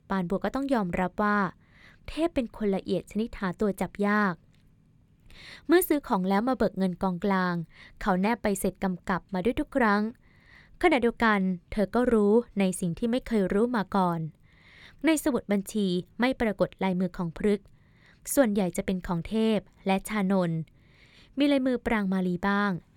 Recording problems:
none

